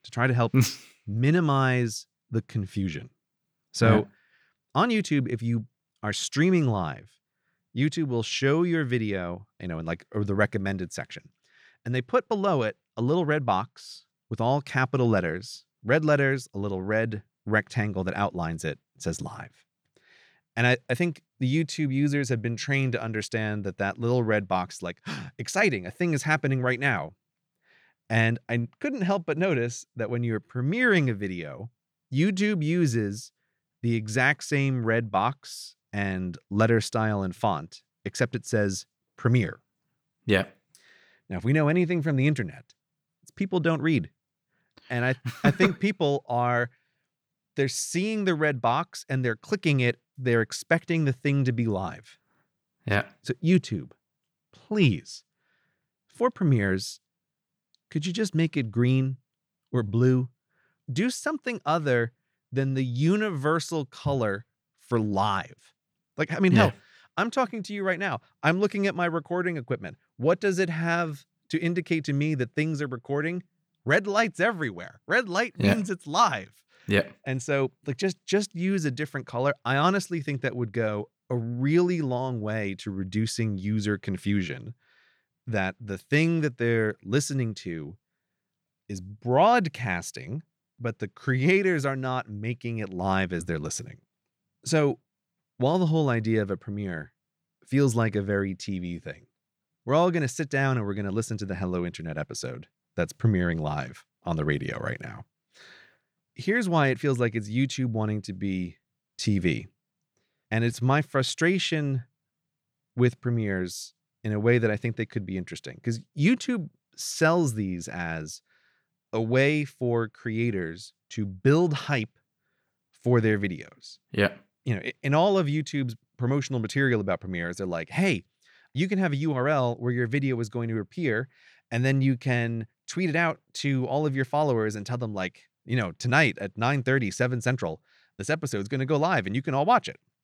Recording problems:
none

